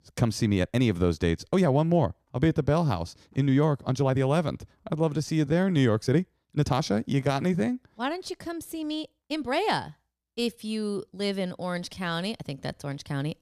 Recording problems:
uneven, jittery; strongly; from 0.5 to 13 s

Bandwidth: 14.5 kHz